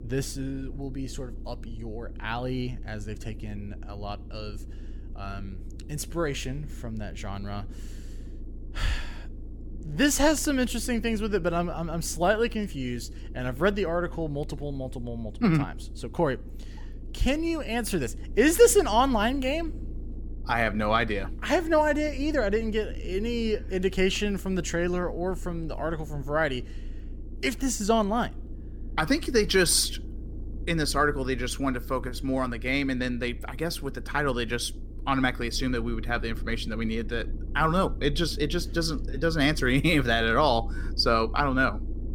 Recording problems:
low rumble; faint; throughout; 25 dB below the speech

